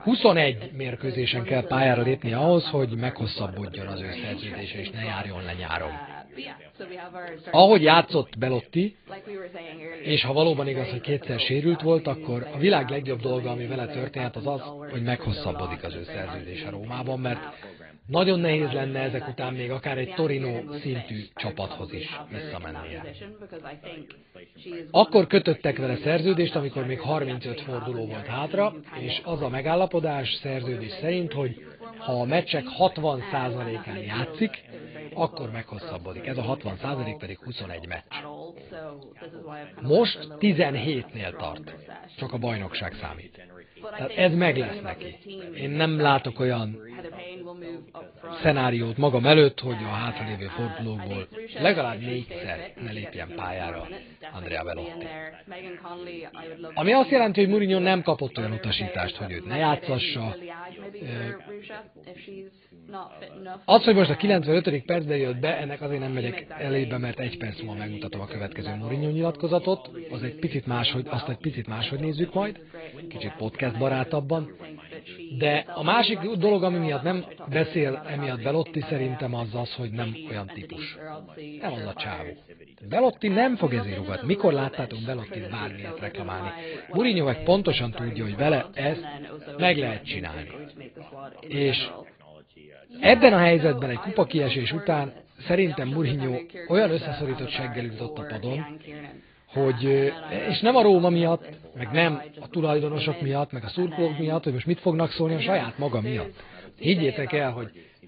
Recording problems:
garbled, watery; badly
high frequencies cut off; severe; nothing above 4.5 kHz
background chatter; noticeable; throughout; 2 voices, 15 dB below the speech

